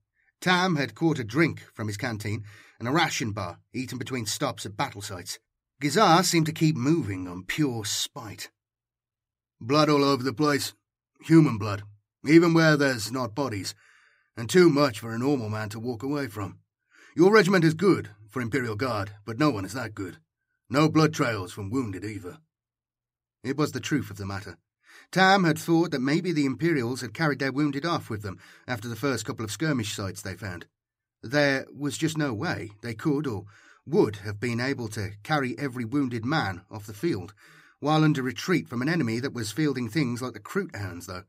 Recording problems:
none

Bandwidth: 15.5 kHz